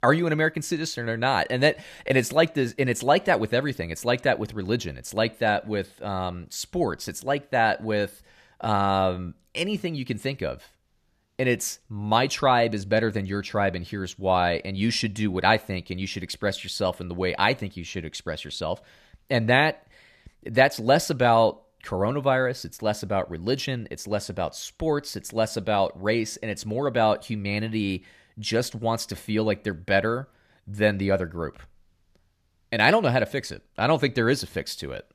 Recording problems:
none

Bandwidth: 14 kHz